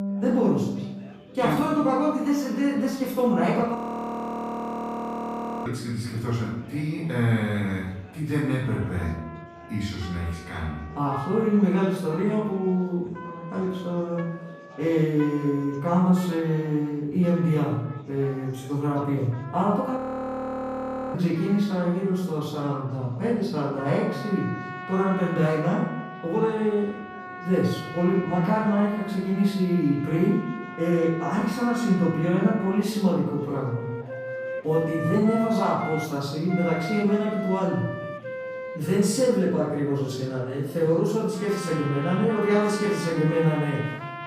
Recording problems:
off-mic speech; far
room echo; noticeable; dies away in 0.7 s
background music; noticeable; throughout; 10 dB below the speech
chatter from many people; faint; throughout; 25 dB below the speech
audio freezing; at 4 s for 2 s and at 20 s for 1 s

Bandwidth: 15 kHz